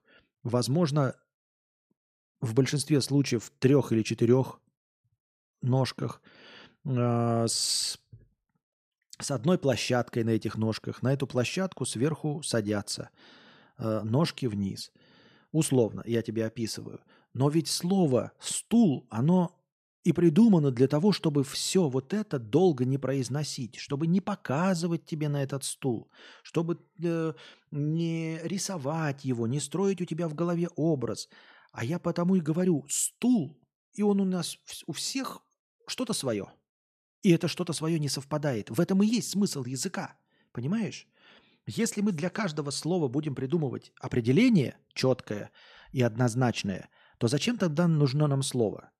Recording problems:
none

